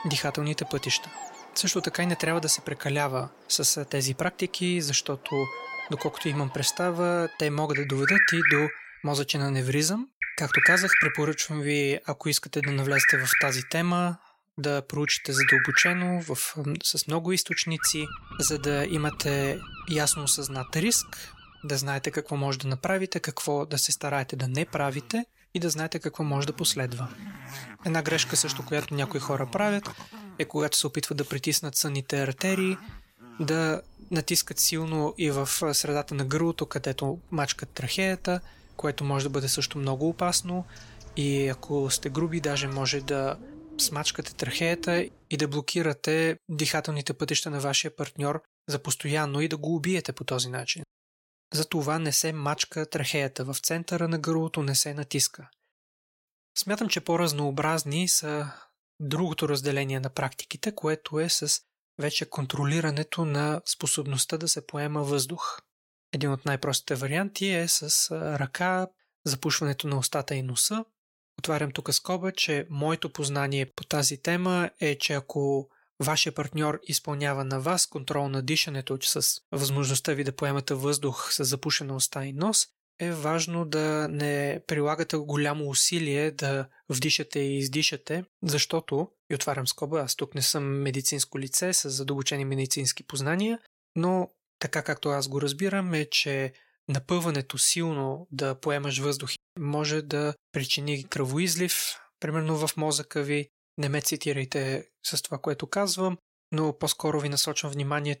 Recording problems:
animal sounds; loud; until 45 s; as loud as the speech

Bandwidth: 16.5 kHz